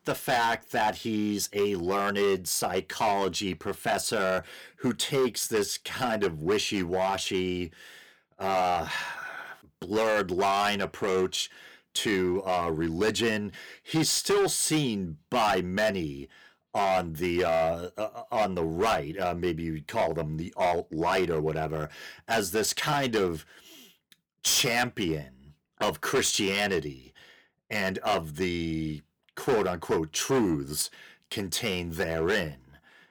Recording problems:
distortion; heavy; 7% of the sound clipped

